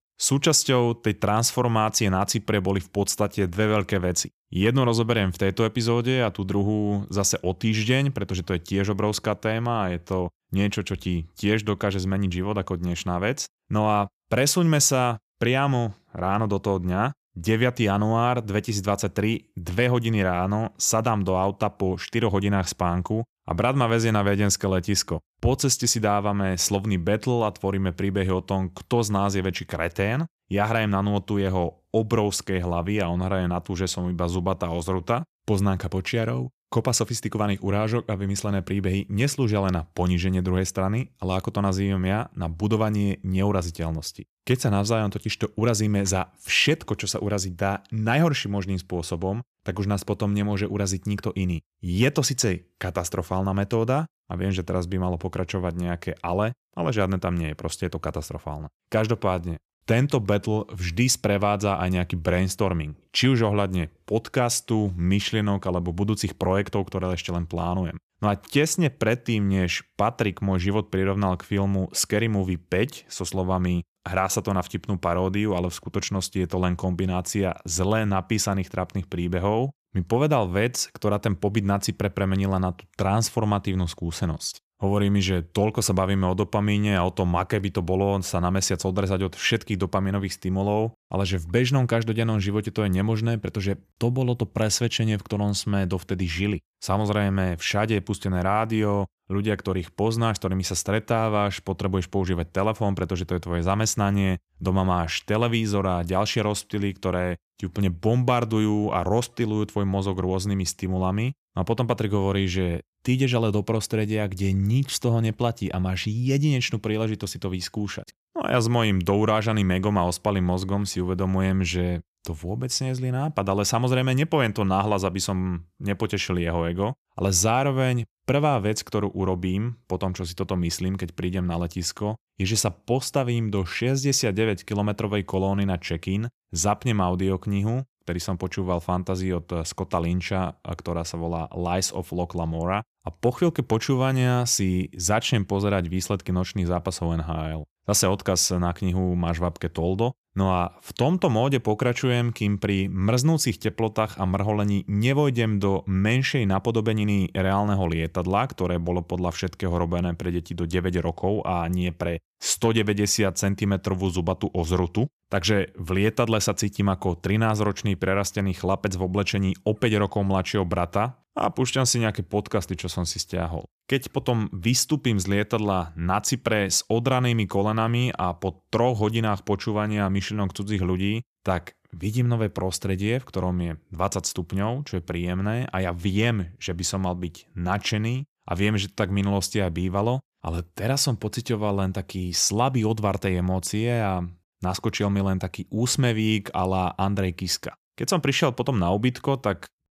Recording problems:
none

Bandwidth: 14.5 kHz